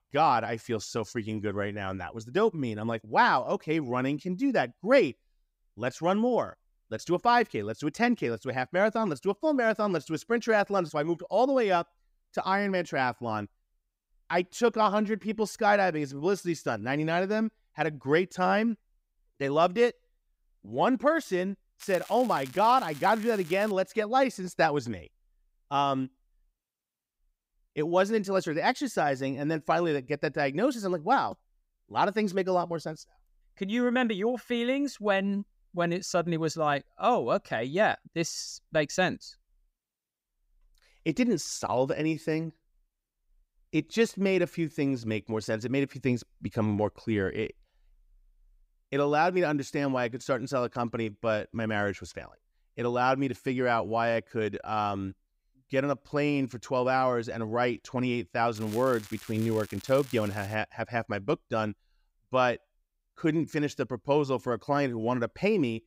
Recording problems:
crackling; noticeable; from 22 to 24 s and from 59 s to 1:01; 20 dB below the speech

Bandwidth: 15.5 kHz